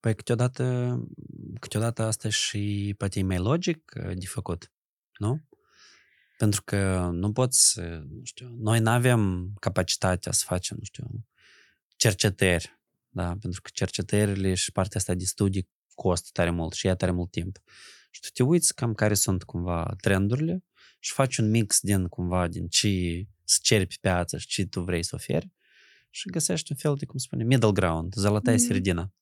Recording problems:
none

